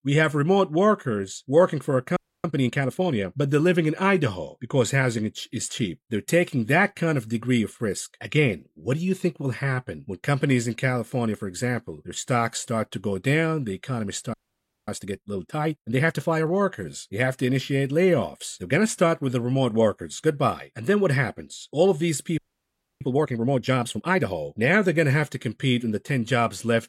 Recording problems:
audio freezing; at 2 s, at 14 s for 0.5 s and at 22 s for 0.5 s

